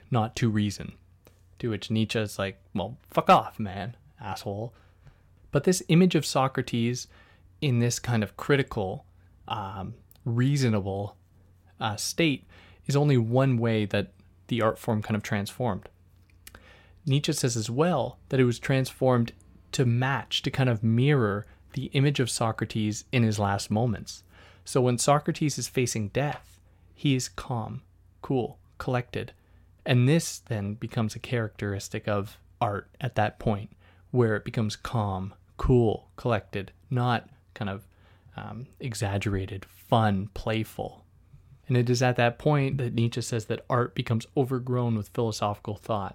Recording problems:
none

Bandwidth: 16.5 kHz